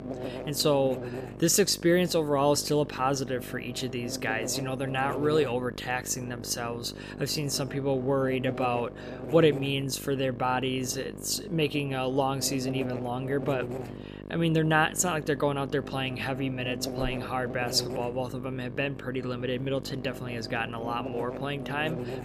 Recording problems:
electrical hum; noticeable; throughout; 50 Hz, 10 dB below the speech

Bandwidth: 14.5 kHz